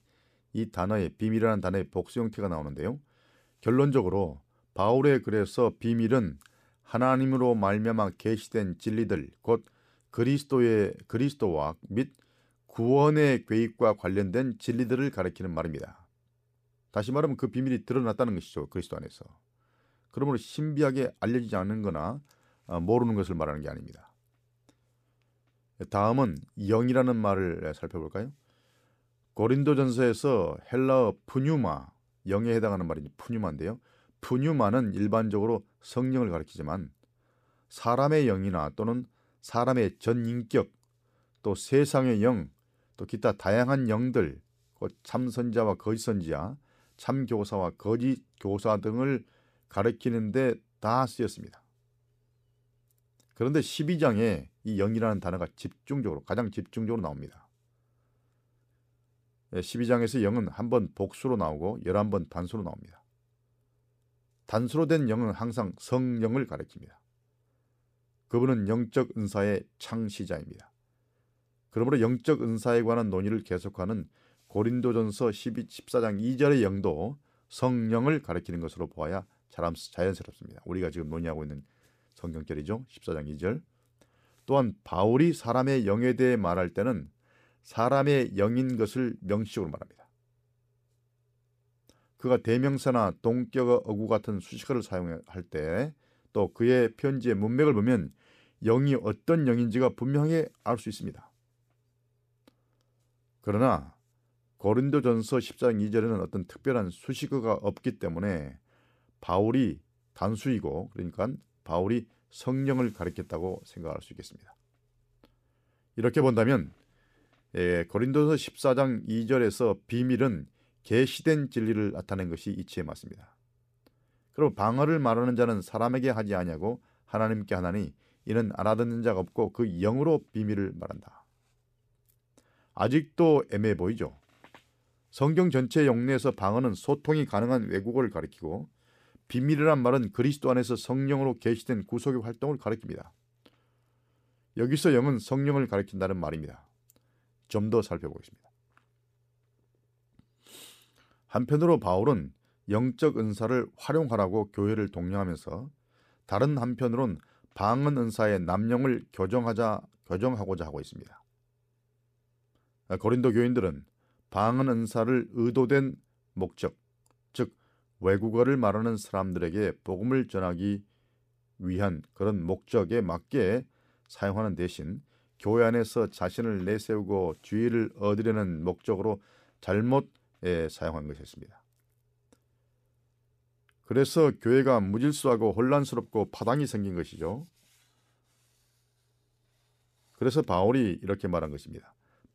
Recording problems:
none

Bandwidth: 14.5 kHz